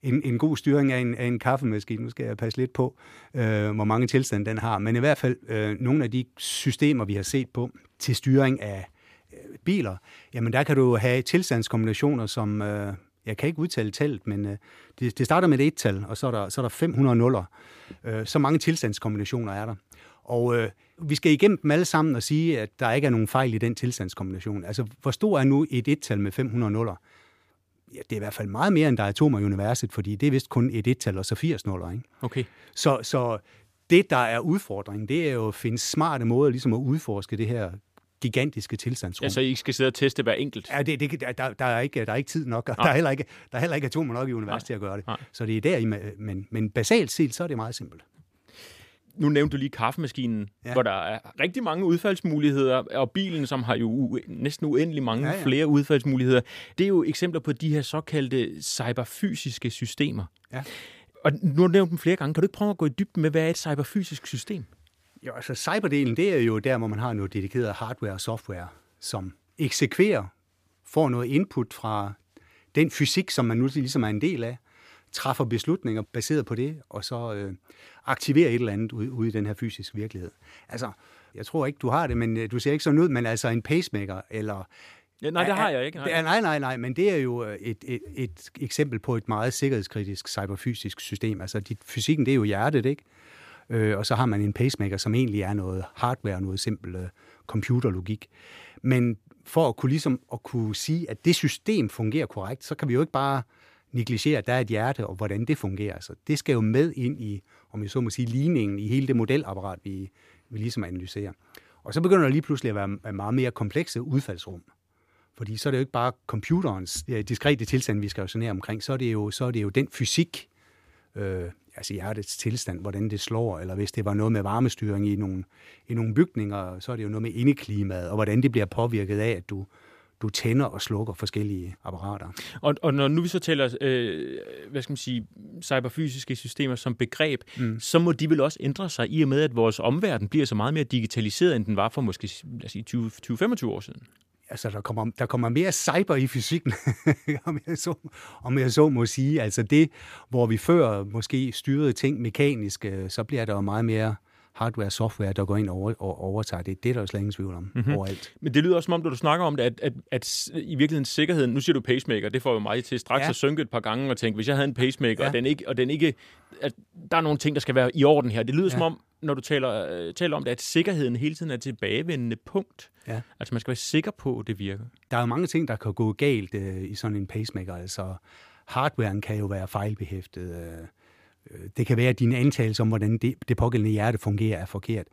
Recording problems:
none

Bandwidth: 15 kHz